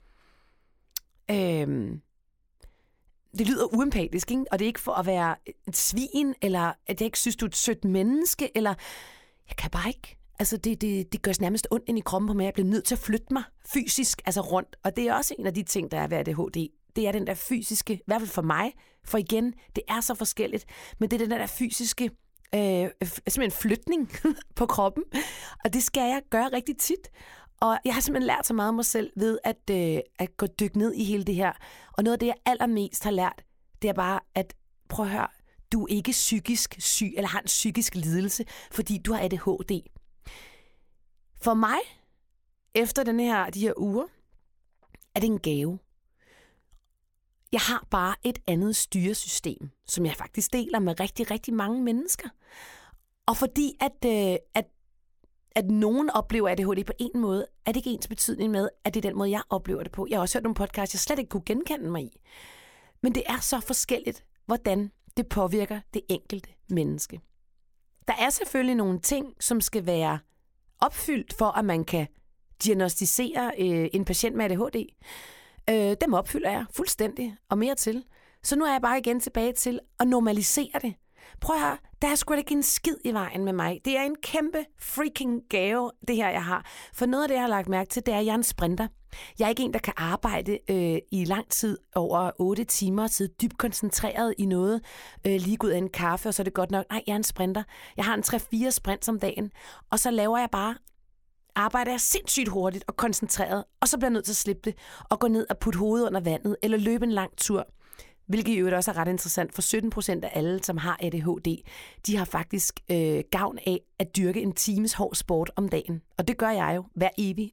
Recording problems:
none

